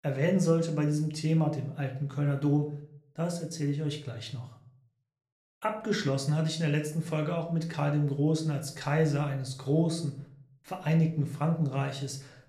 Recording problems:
room echo; slight; dies away in 0.5 s
off-mic speech; somewhat distant

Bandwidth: 13.5 kHz